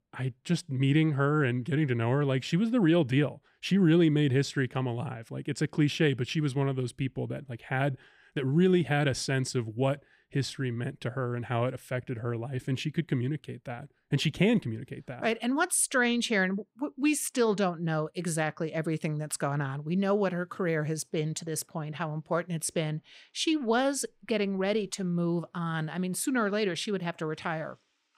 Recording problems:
none

